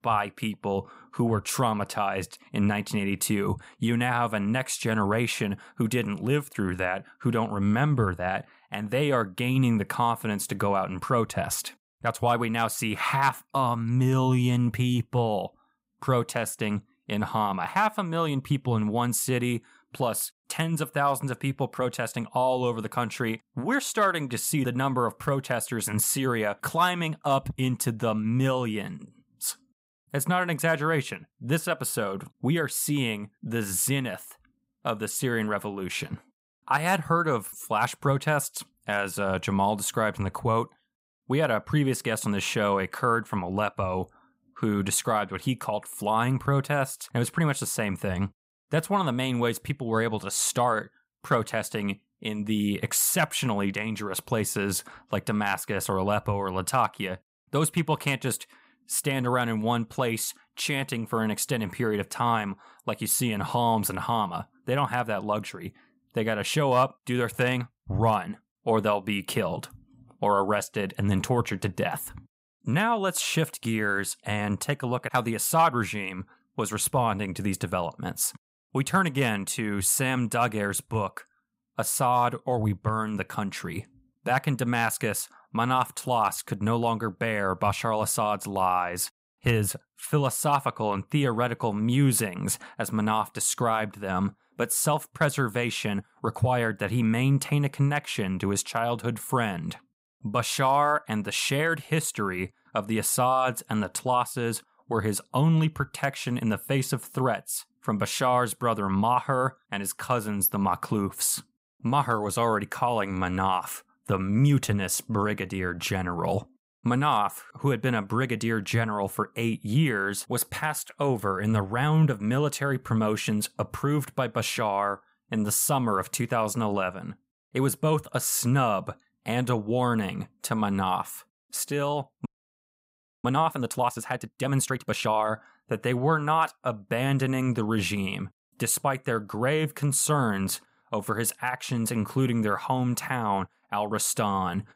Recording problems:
audio freezing; at 2:12 for 1 s

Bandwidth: 15.5 kHz